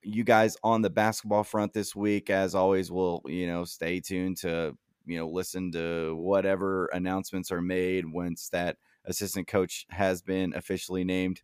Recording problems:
none

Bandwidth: 15 kHz